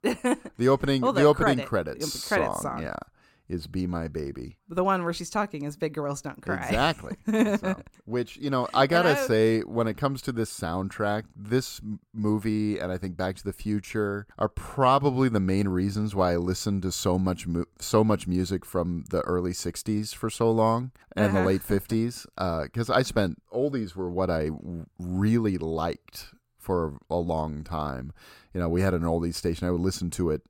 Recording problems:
none

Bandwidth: 16.5 kHz